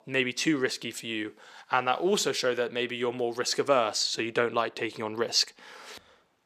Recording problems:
thin; somewhat; fading below 350 Hz

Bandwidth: 14.5 kHz